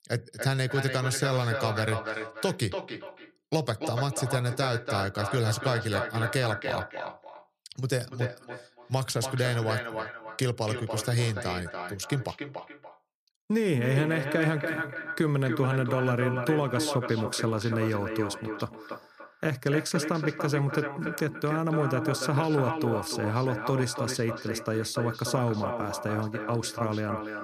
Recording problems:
echo of what is said; strong; throughout; 290 ms later, 6 dB below the speech

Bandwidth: 14.5 kHz